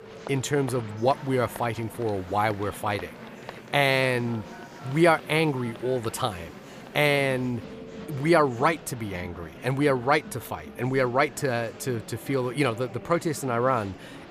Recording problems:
murmuring crowd; noticeable; throughout; 15 dB below the speech
alarms or sirens; faint; throughout; 25 dB below the speech

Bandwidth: 15 kHz